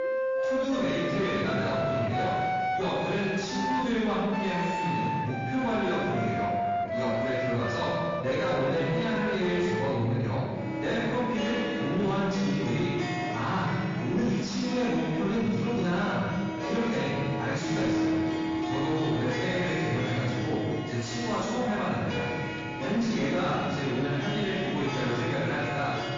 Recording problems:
room echo; strong; dies away in 1.6 s
off-mic speech; far
distortion; slight; 10 dB below the speech
garbled, watery; slightly
background music; loud; throughout; 3 dB below the speech
voice in the background; faint; throughout; 20 dB below the speech

